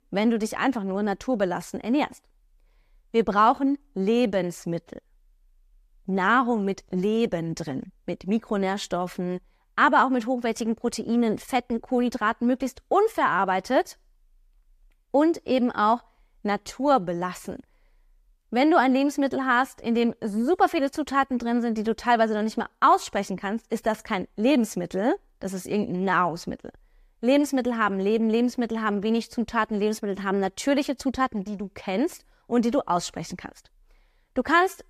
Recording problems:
none

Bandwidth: 14.5 kHz